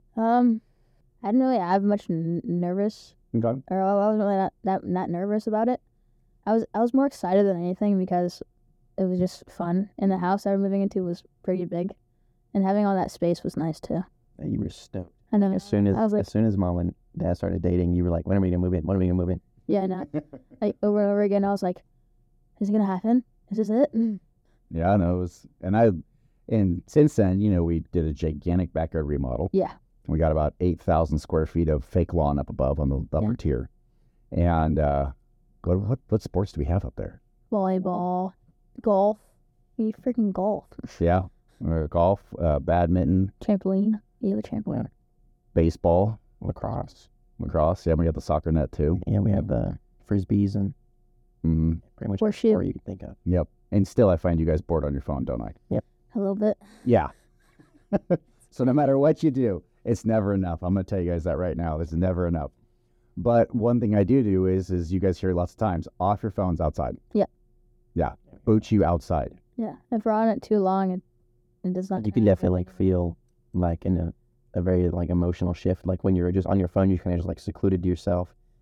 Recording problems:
muffled; very; fading above 1 kHz

